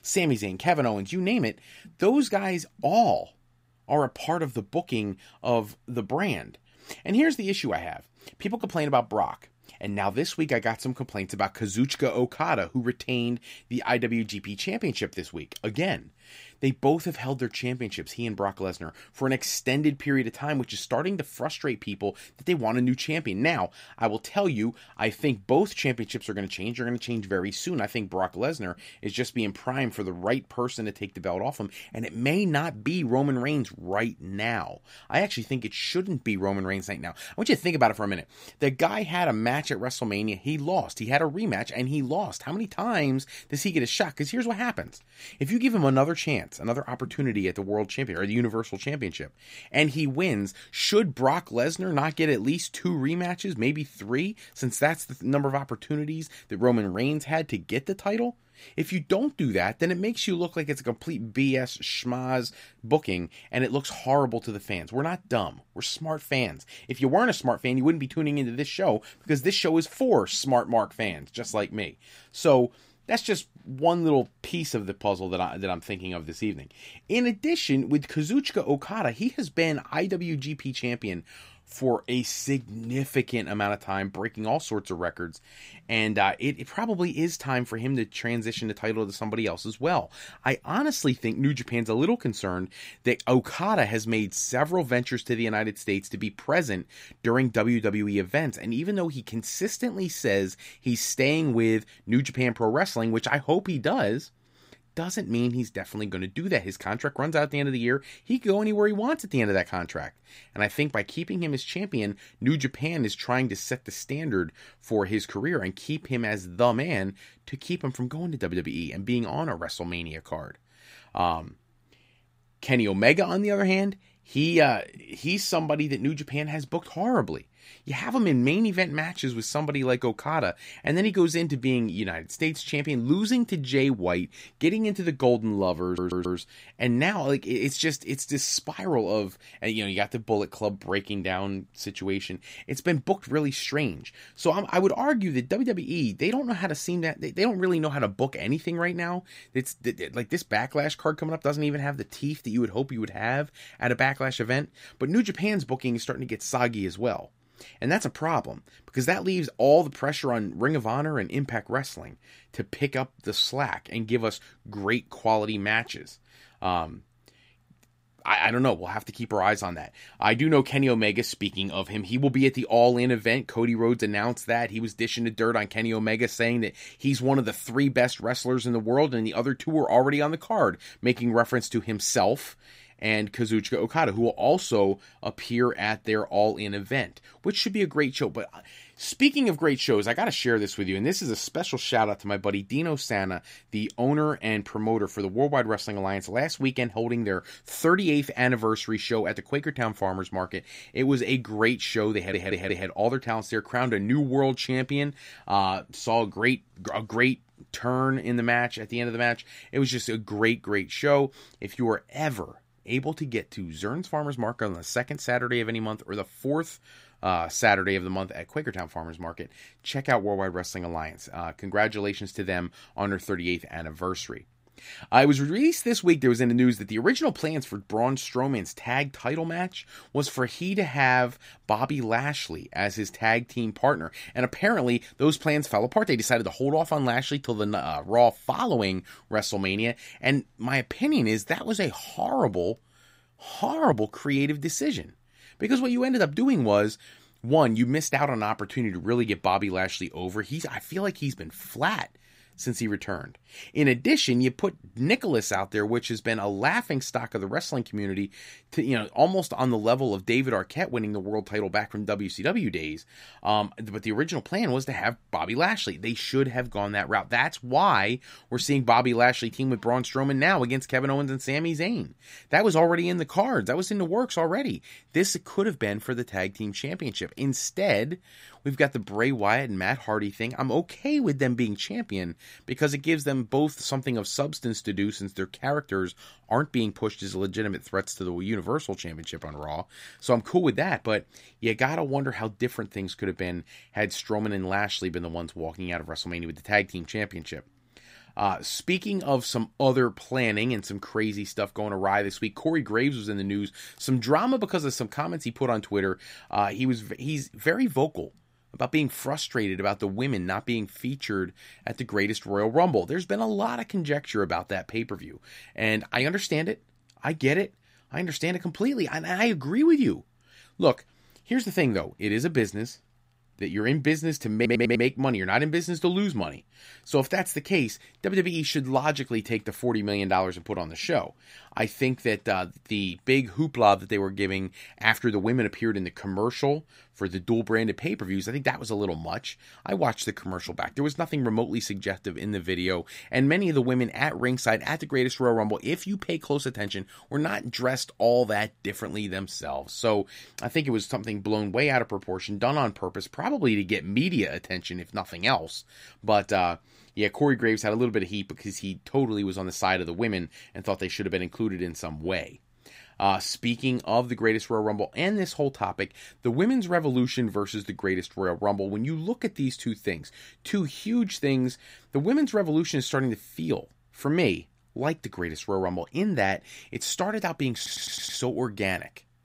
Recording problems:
audio stuttering; 4 times, first at 2:16

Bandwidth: 15.5 kHz